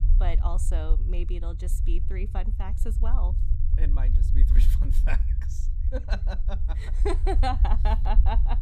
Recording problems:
low rumble; noticeable; throughout; 10 dB below the speech

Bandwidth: 15 kHz